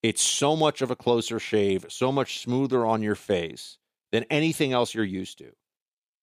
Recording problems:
thin; somewhat; fading below 300 Hz

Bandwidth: 15 kHz